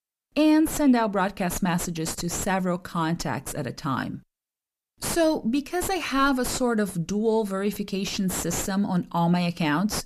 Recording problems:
distortion; slight; 5 dB below the speech

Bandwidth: 14.5 kHz